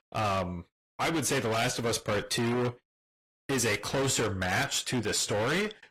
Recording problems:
distortion; heavy; 25% of the sound clipped
garbled, watery; slightly; nothing above 14.5 kHz

